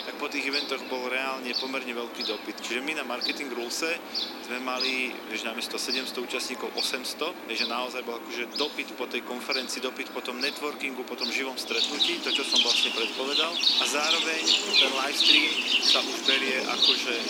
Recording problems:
thin; somewhat; fading below 250 Hz
animal sounds; very loud; throughout; 6 dB above the speech
hiss; faint; throughout; 25 dB below the speech

